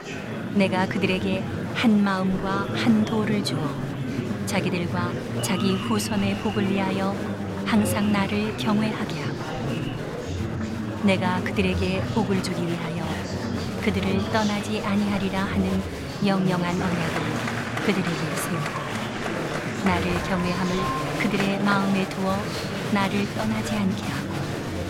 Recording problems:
murmuring crowd; loud; throughout; 3 dB below the speech

